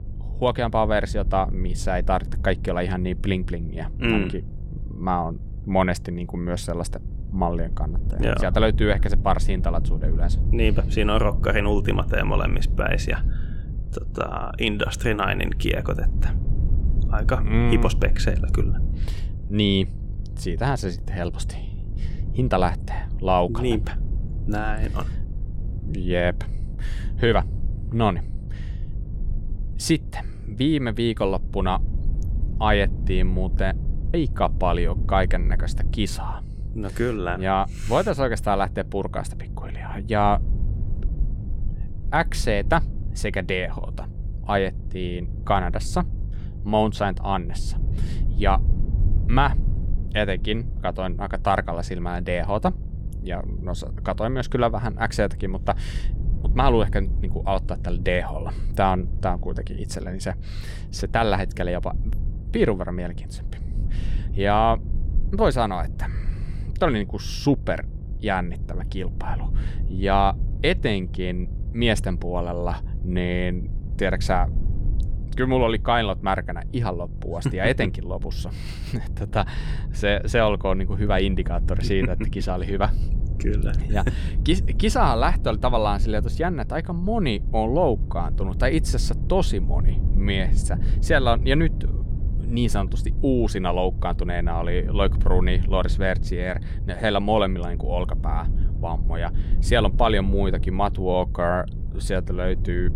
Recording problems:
electrical hum; faint; throughout; 50 Hz, 25 dB below the speech
low rumble; faint; throughout; 20 dB below the speech

